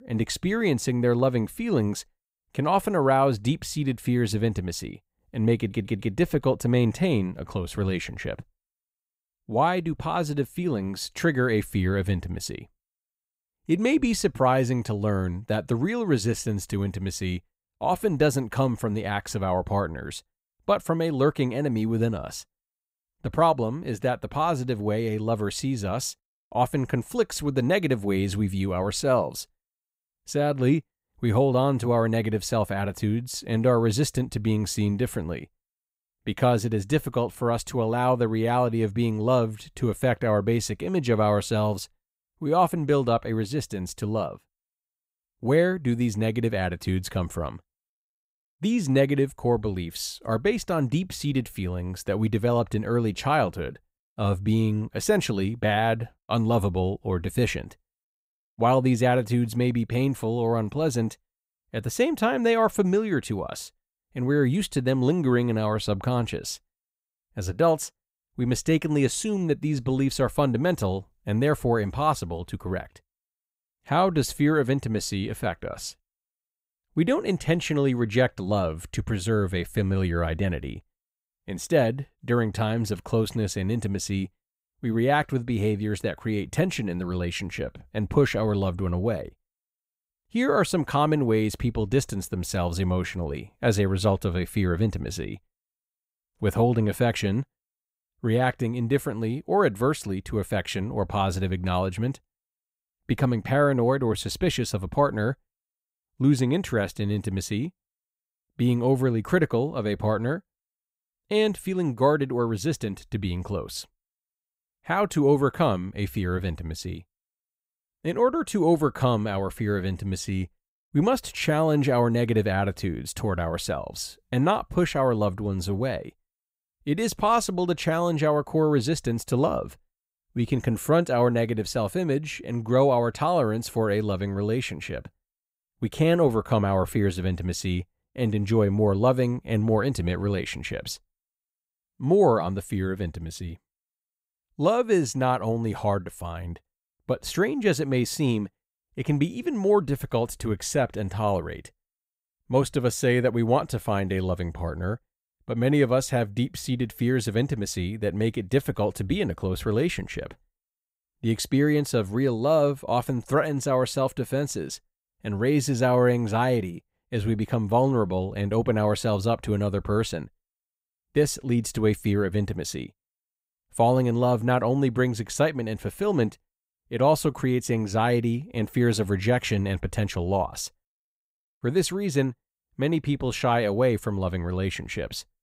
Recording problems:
audio stuttering; at 5.5 s

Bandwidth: 15.5 kHz